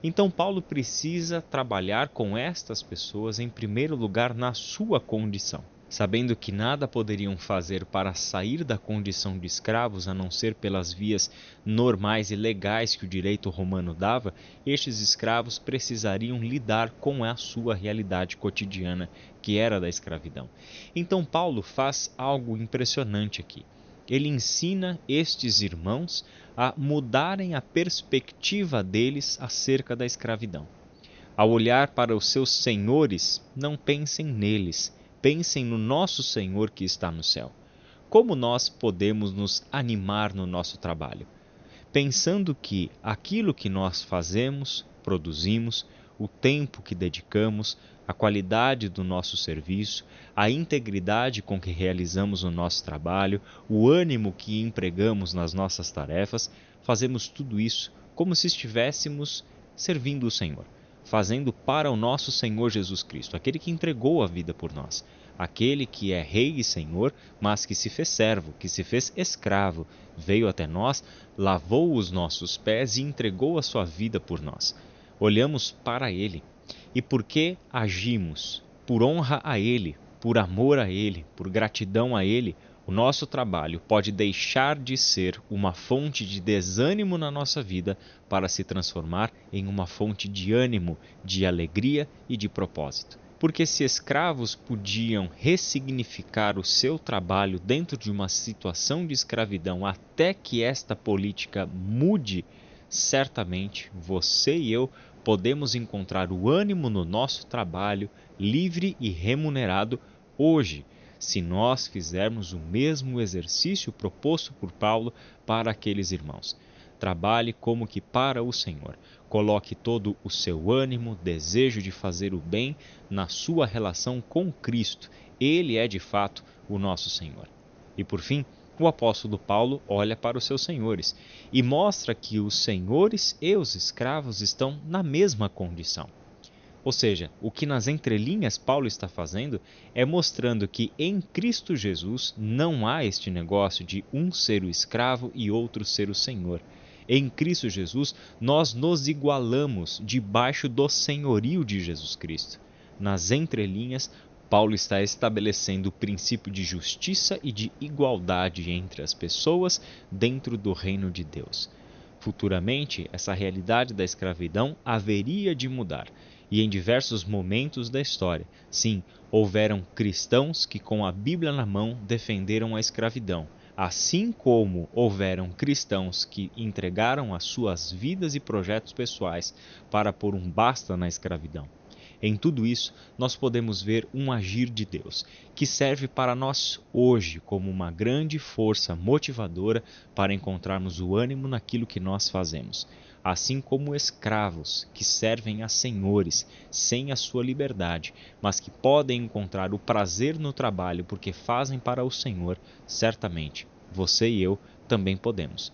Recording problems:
high frequencies cut off; noticeable; nothing above 6.5 kHz
hiss; faint; throughout; 25 dB below the speech

